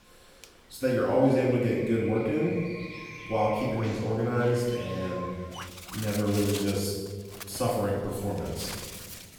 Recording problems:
off-mic speech; far
room echo; noticeable; dies away in 1.2 s
animal sounds; noticeable; throughout; 10 dB below the speech

